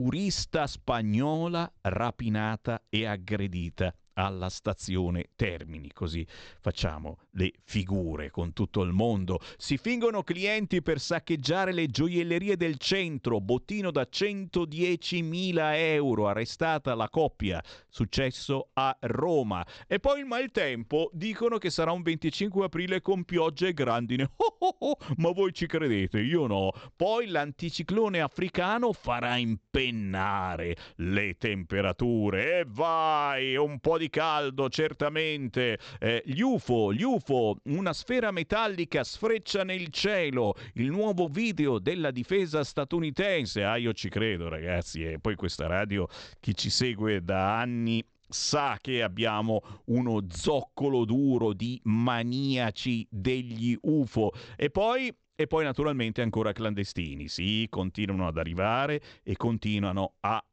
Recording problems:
high frequencies cut off; noticeable; nothing above 8 kHz
abrupt cut into speech; at the start

